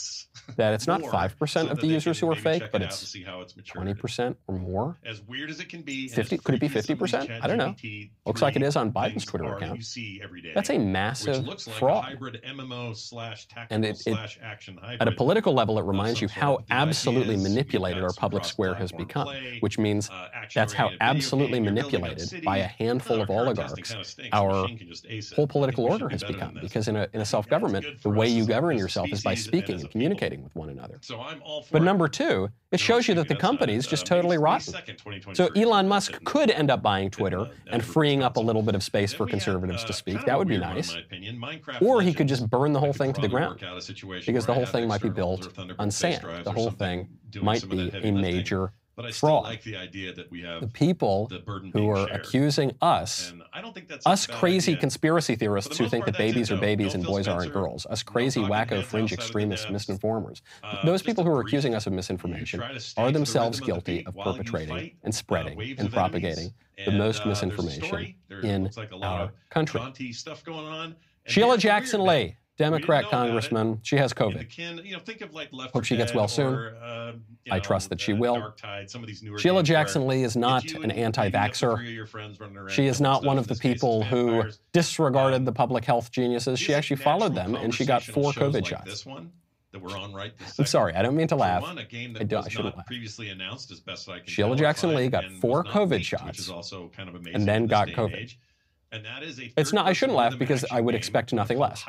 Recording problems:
voice in the background; noticeable; throughout; 10 dB below the speech

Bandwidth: 15.5 kHz